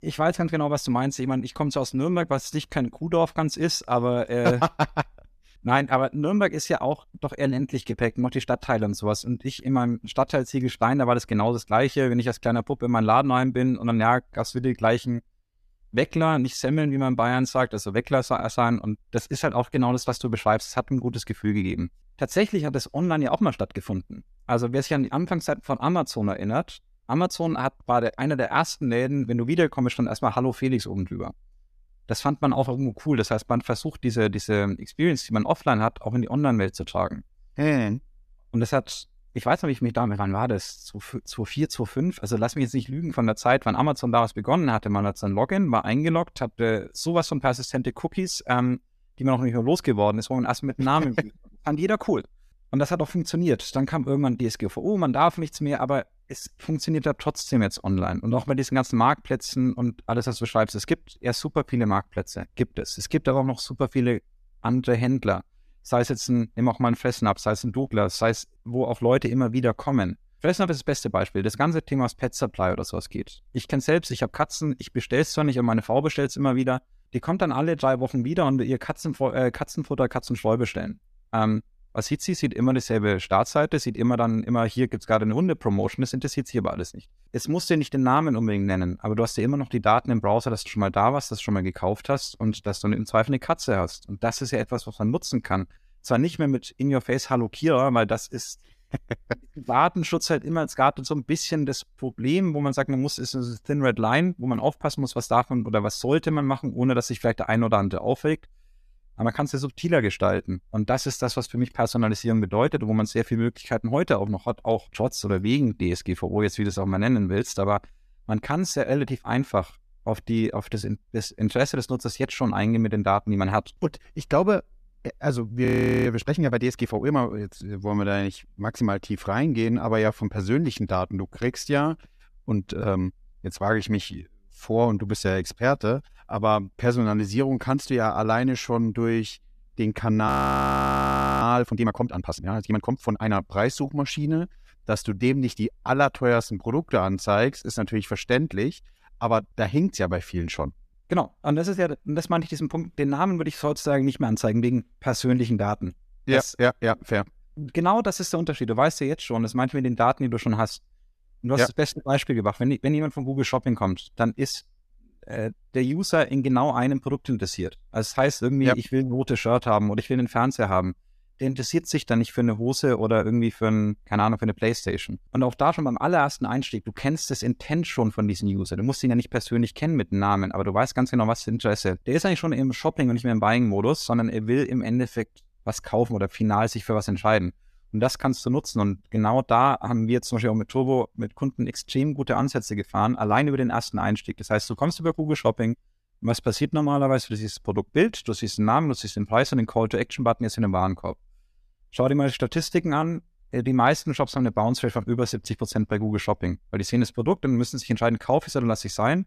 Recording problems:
audio freezing; at 2:06 and at 2:20 for 1 s

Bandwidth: 14.5 kHz